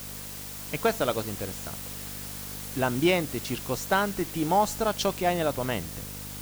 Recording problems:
hiss; loud; throughout; 9 dB below the speech
electrical hum; faint; throughout; 50 Hz, 25 dB below the speech

